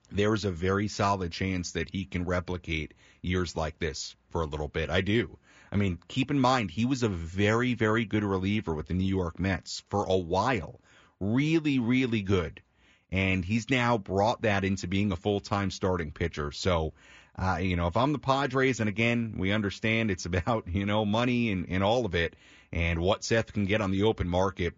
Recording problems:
high frequencies cut off; noticeable; nothing above 7.5 kHz

